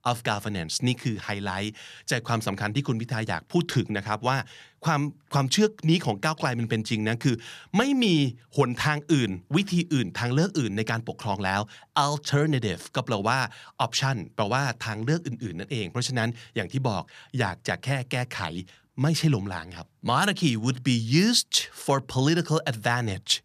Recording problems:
none

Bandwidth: 14.5 kHz